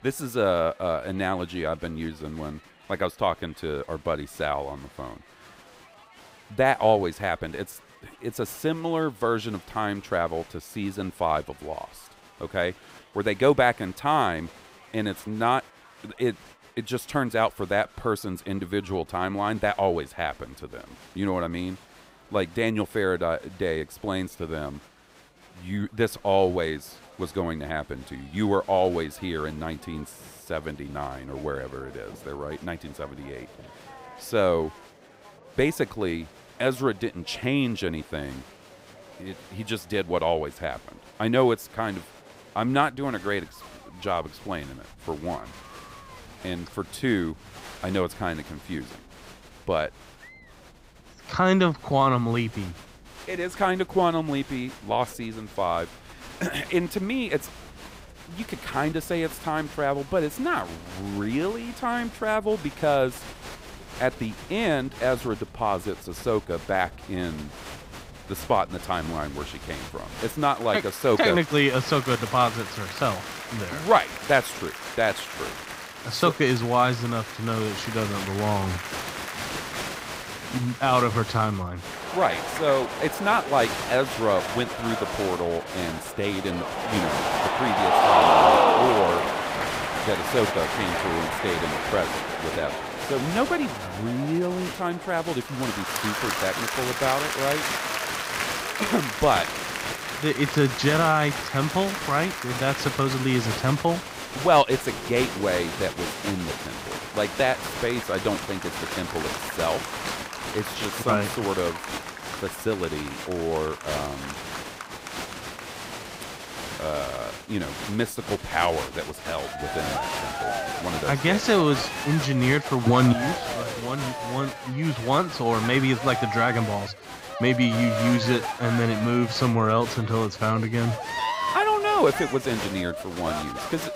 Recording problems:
crowd noise; loud; throughout; 3 dB below the speech

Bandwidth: 15.5 kHz